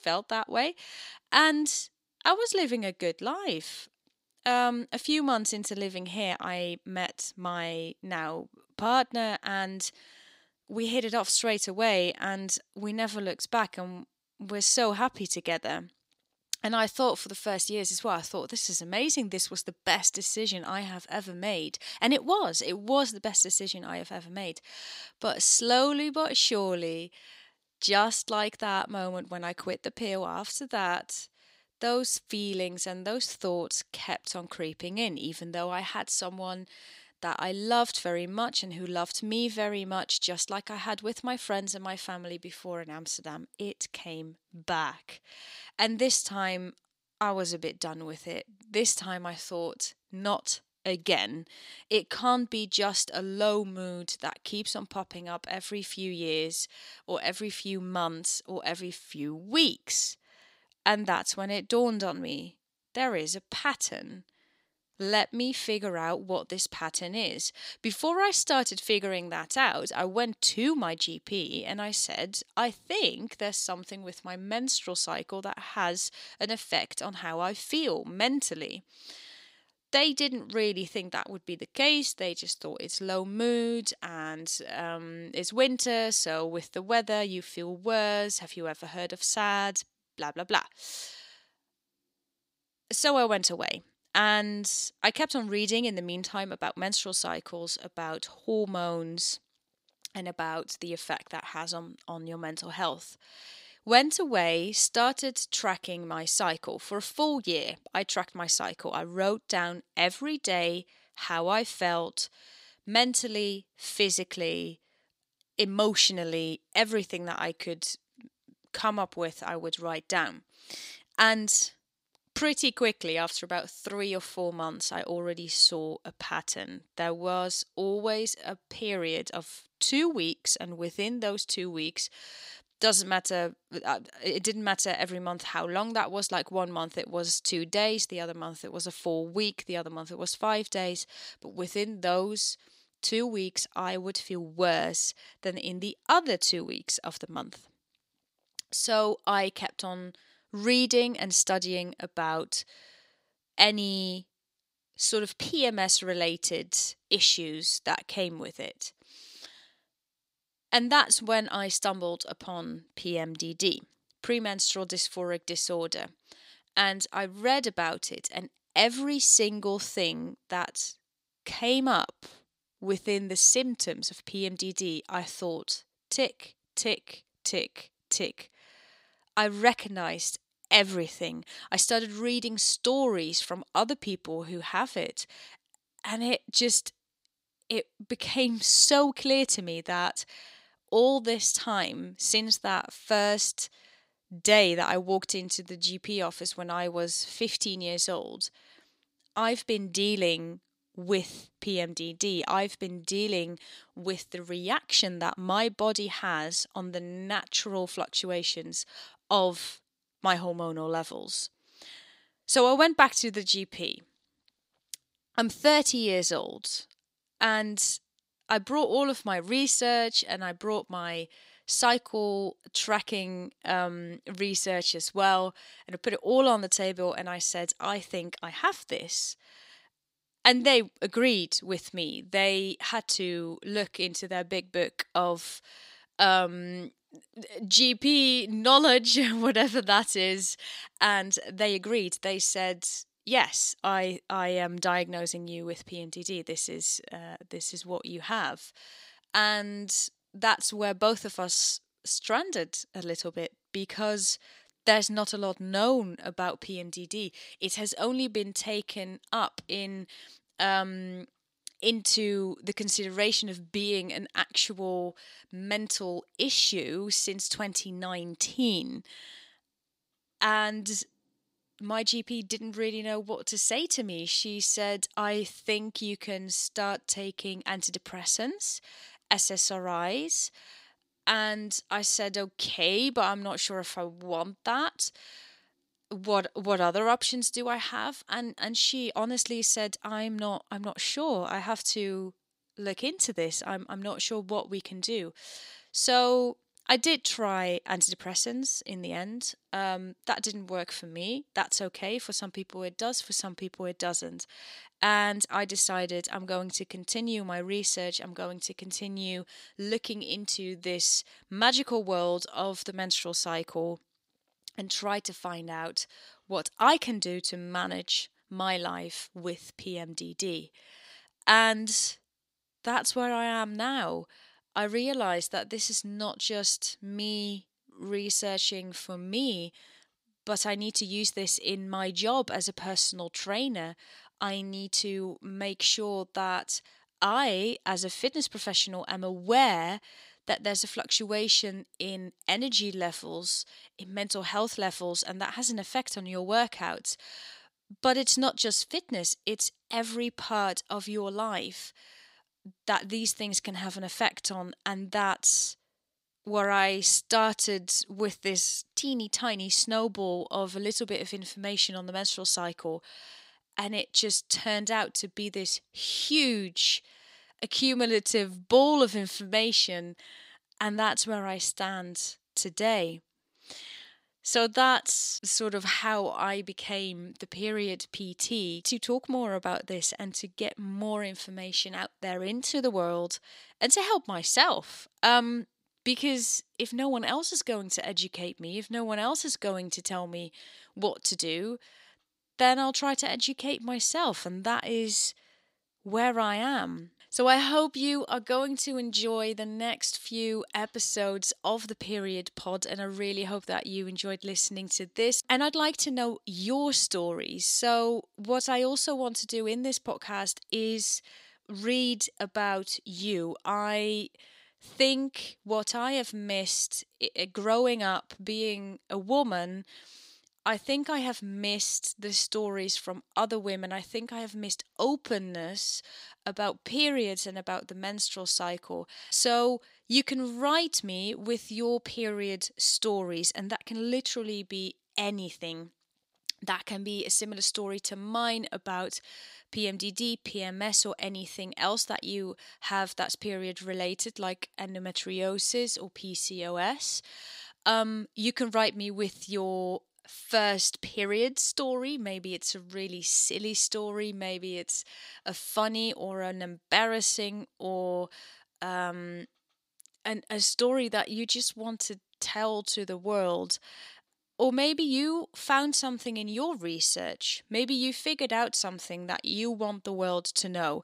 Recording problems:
thin; very slightly; fading below 1 kHz

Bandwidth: 15.5 kHz